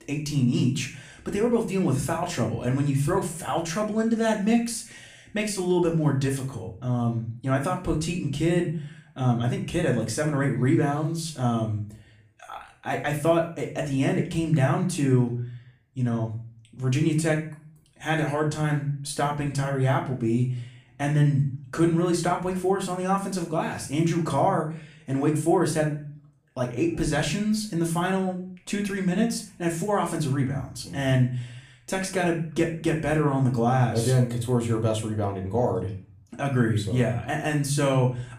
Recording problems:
off-mic speech; far
room echo; slight; dies away in 0.4 s

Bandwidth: 15 kHz